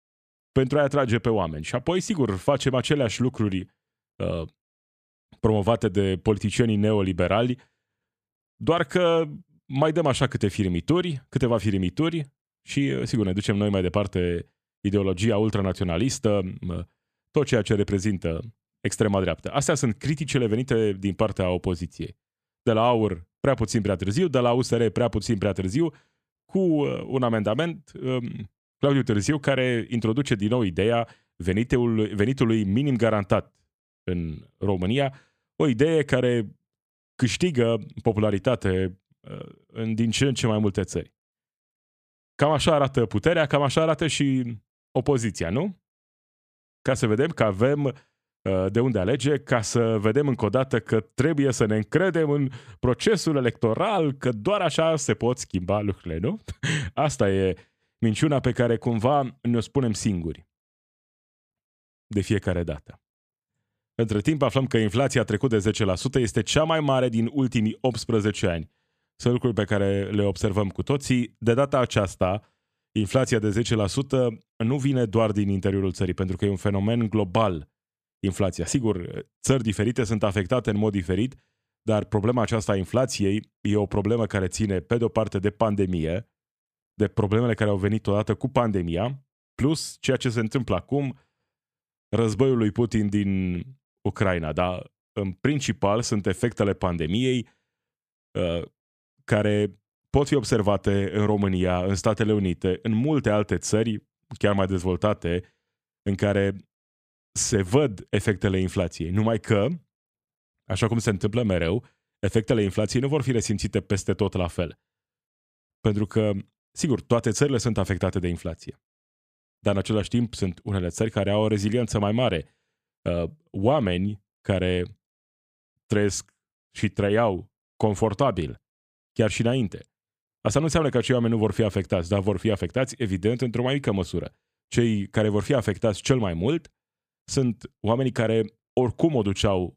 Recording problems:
none

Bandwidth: 14.5 kHz